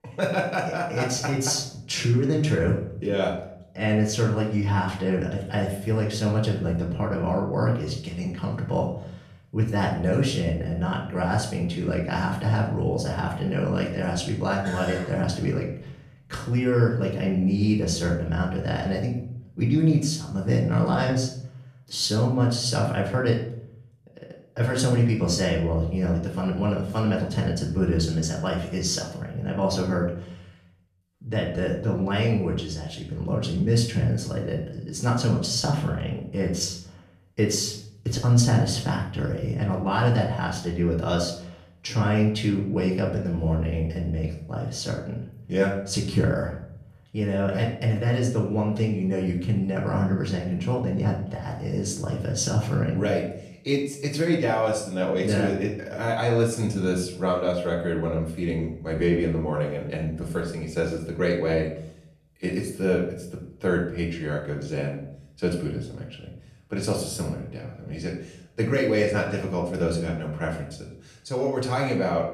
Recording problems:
off-mic speech; far
room echo; slight; dies away in 0.6 s

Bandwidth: 14 kHz